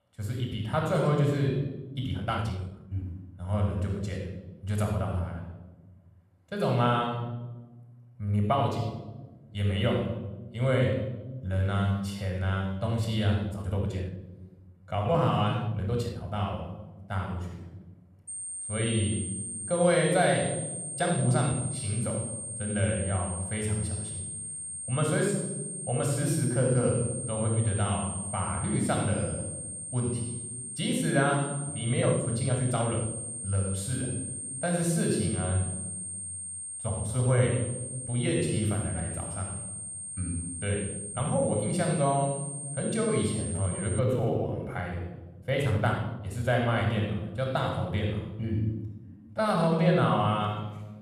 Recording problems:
room echo; noticeable; dies away in 1.1 s
off-mic speech; somewhat distant
high-pitched whine; loud; from 18 to 44 s; 8.5 kHz, 6 dB below the speech
uneven, jittery; strongly; from 2 to 50 s

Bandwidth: 14.5 kHz